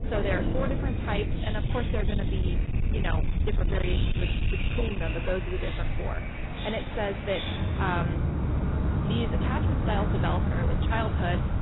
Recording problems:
garbled, watery; badly; nothing above 4 kHz
distortion; slight; 15% of the sound clipped
rain or running water; very loud; throughout; 2 dB above the speech
wind noise on the microphone; occasional gusts; 10 dB below the speech

